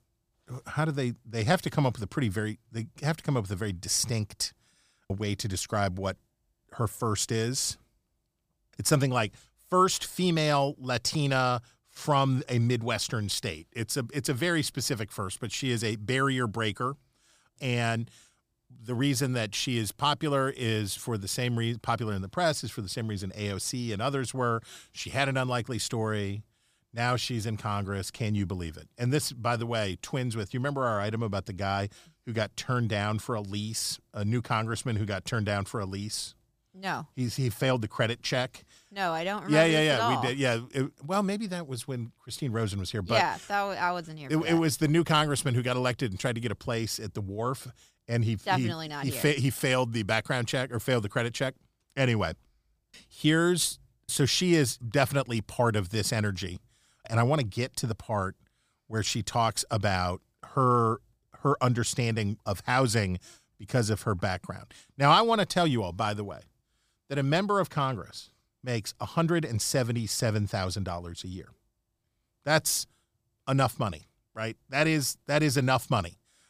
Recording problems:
none

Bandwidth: 15 kHz